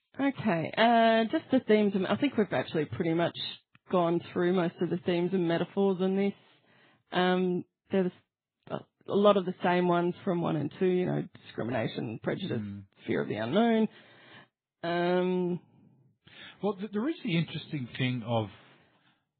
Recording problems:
garbled, watery; badly
high frequencies cut off; severe; nothing above 4 kHz

